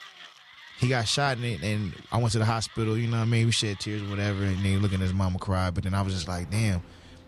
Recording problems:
machinery noise; noticeable; throughout; 20 dB below the speech

